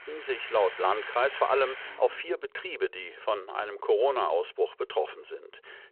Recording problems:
phone-call audio
traffic noise; noticeable; until 2 s; 10 dB below the speech

